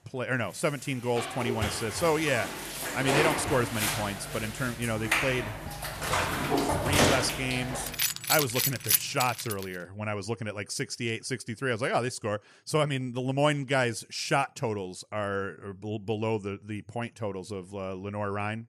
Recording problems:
household noises; very loud; until 9.5 s; 1 dB above the speech

